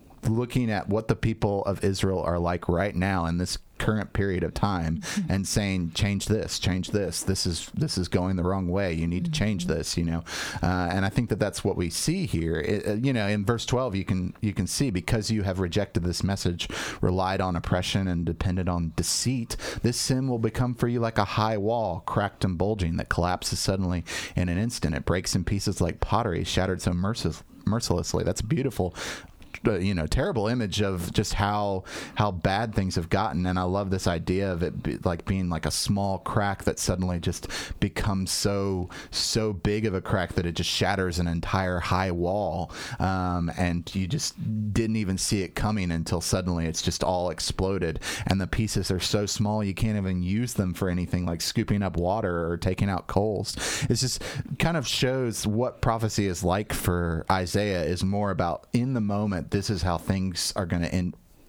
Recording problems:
squashed, flat; heavily

